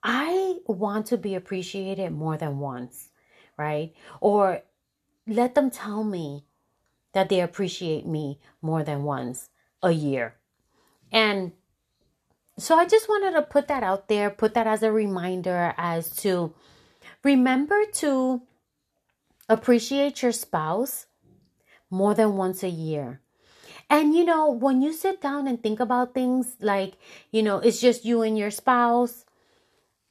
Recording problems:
none

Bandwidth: 13.5 kHz